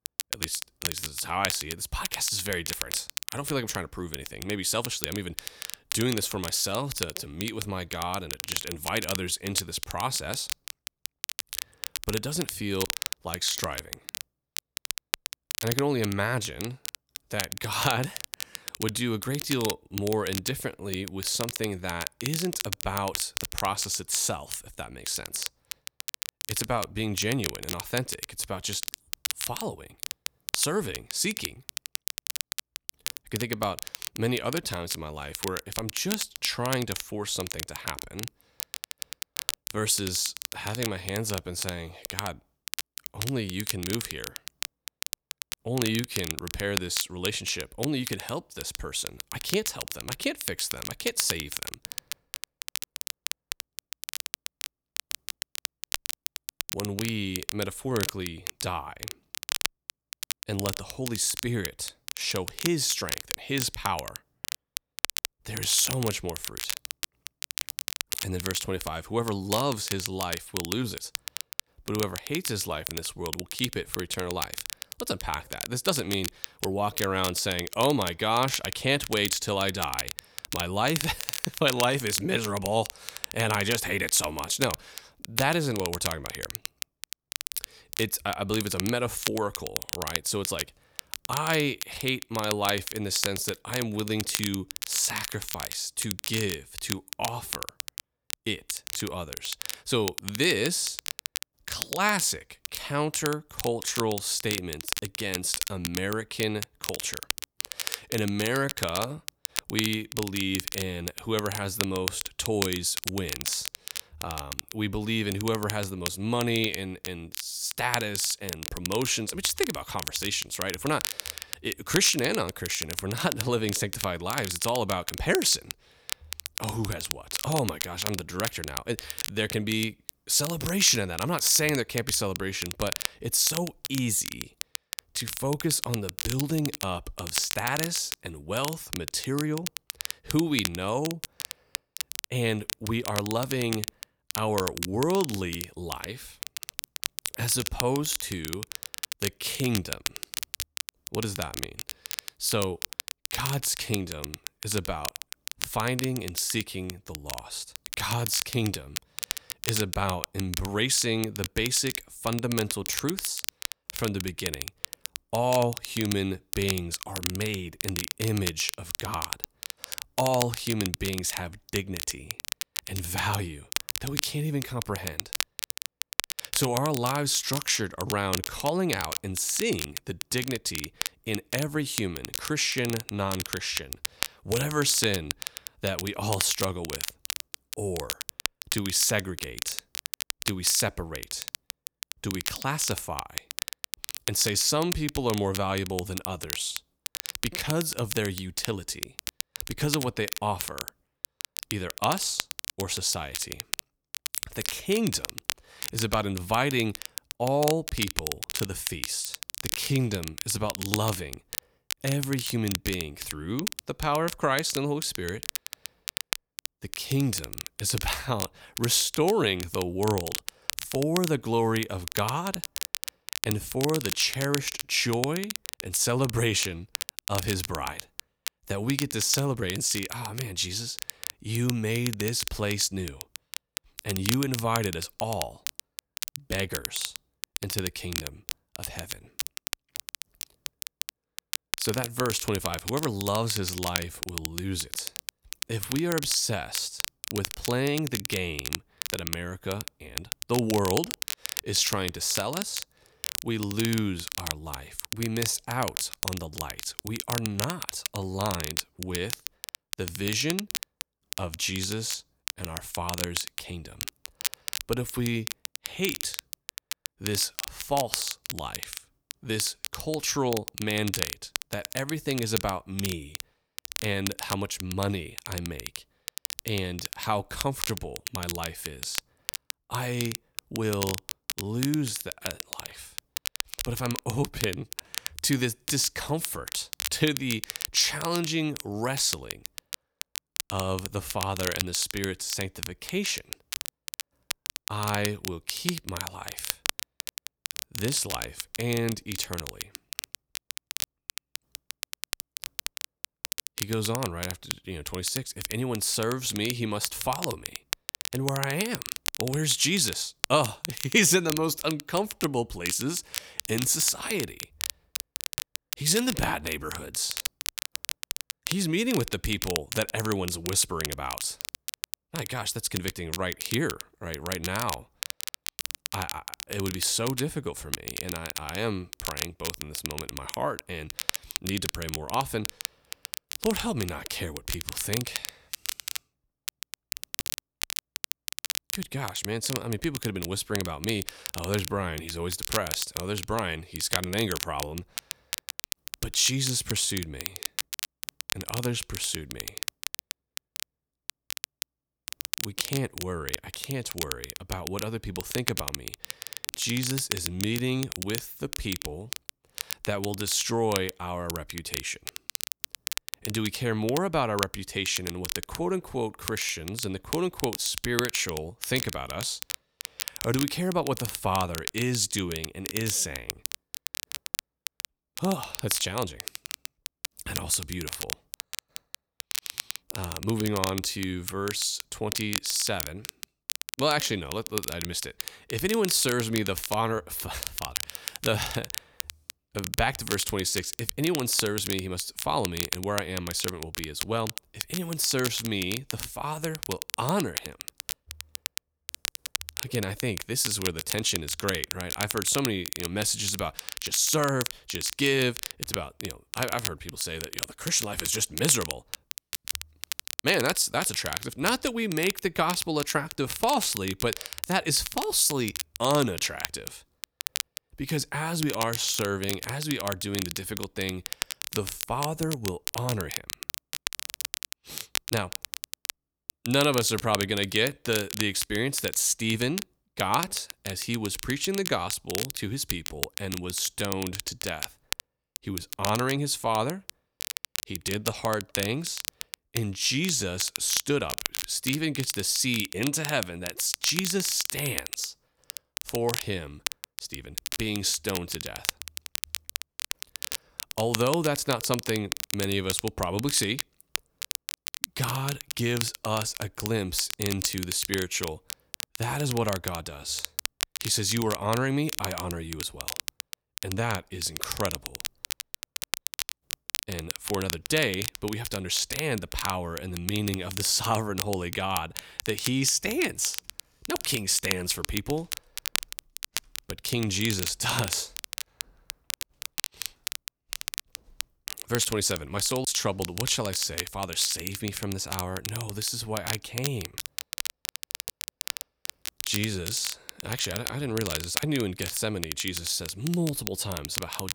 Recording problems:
crackle, like an old record; loud; 6 dB below the speech

